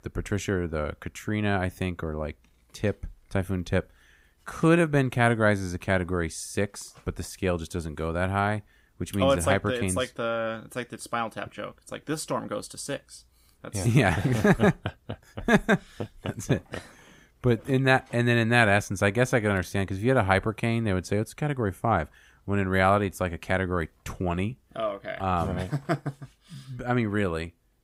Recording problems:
none

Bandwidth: 15.5 kHz